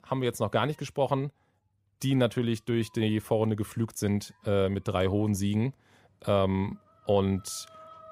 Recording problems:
animal sounds; faint; throughout; 30 dB below the speech

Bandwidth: 15.5 kHz